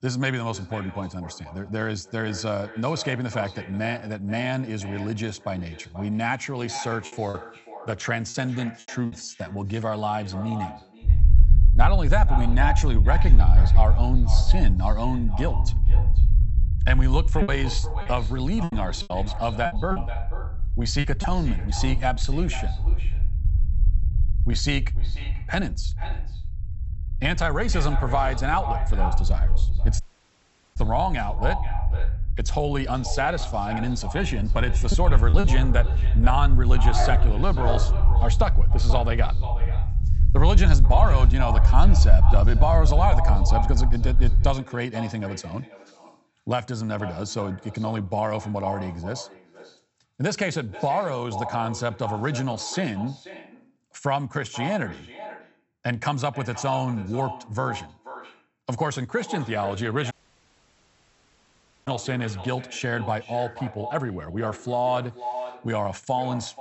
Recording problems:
echo of what is said; strong; throughout; 480 ms later, 10 dB below the speech
high frequencies cut off; noticeable; nothing above 8 kHz
low rumble; noticeable; from 11 to 45 s; 15 dB below the speech
choppy; very; from 7 to 9 s, from 17 to 21 s and at 35 s; 9% of the speech affected
audio cutting out; at 30 s for 1 s and at 1:00 for 2 s
dog barking; noticeable; from 34 to 38 s; peak 1 dB below the speech

